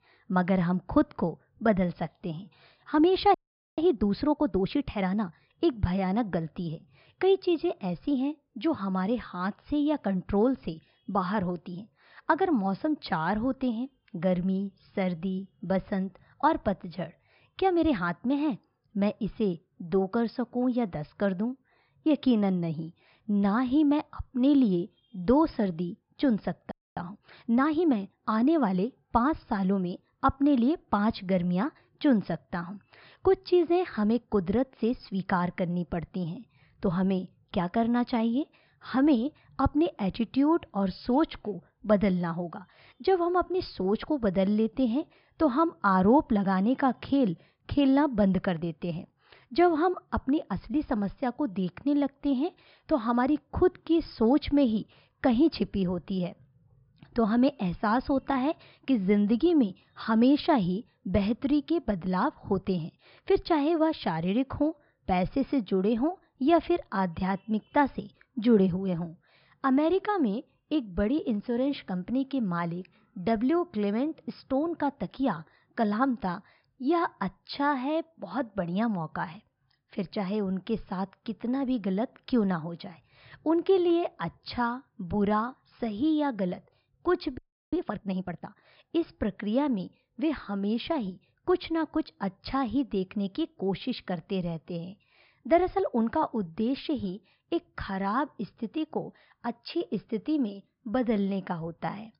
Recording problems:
high frequencies cut off; noticeable; nothing above 5.5 kHz
muffled; very slightly; fading above 3.5 kHz
audio freezing; at 3.5 s, at 27 s and at 1:27

